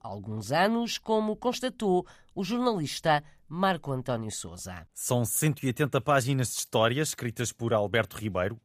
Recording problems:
none

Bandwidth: 15 kHz